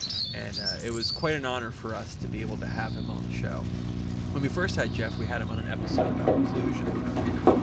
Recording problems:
garbled, watery; slightly; nothing above 7.5 kHz
animal sounds; very loud; throughout; 4 dB above the speech
electrical hum; loud; from 2 s on; 60 Hz, 9 dB below the speech
wind noise on the microphone; occasional gusts; 15 dB below the speech

